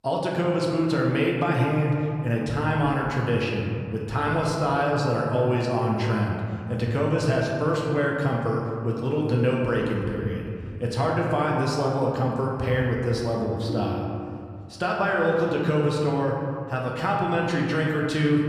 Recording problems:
room echo; noticeable; dies away in 2.1 s
off-mic speech; somewhat distant
phone ringing; noticeable; at 14 s; peak 9 dB below the speech

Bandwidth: 15 kHz